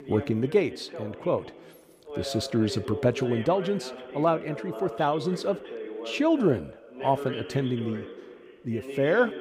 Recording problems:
voice in the background; noticeable; throughout; 10 dB below the speech

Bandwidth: 15.5 kHz